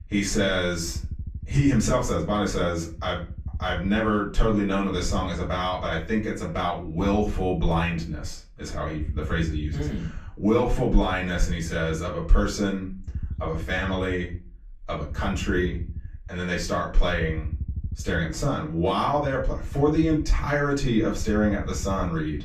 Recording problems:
off-mic speech; far
room echo; slight; dies away in 0.3 s
low rumble; faint; throughout; 25 dB below the speech

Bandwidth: 14.5 kHz